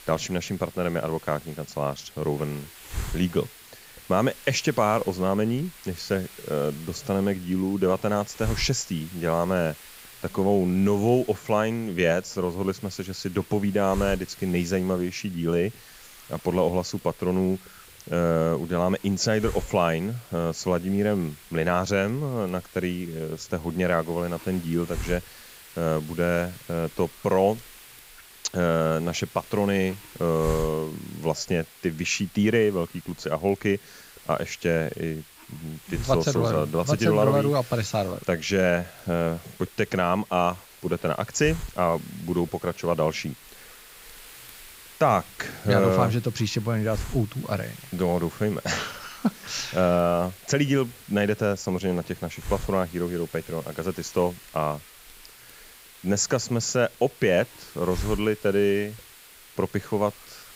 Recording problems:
high frequencies cut off; noticeable; nothing above 8 kHz
hiss; noticeable; throughout; 15 dB below the speech

